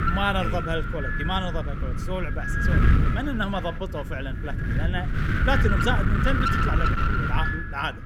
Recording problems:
wind noise on the microphone; heavy; 1 dB above the speech

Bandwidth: 18 kHz